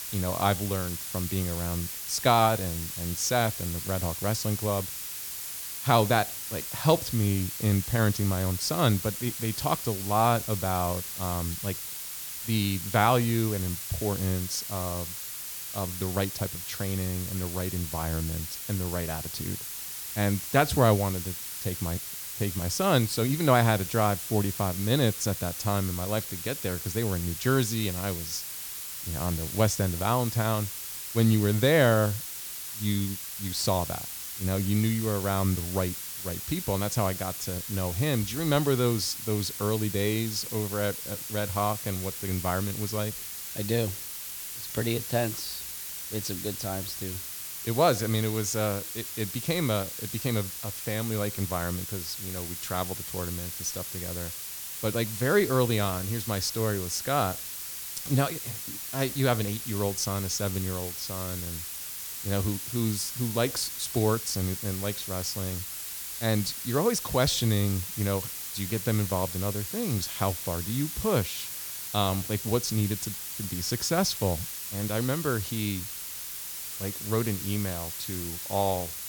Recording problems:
hiss; loud; throughout; 5 dB below the speech

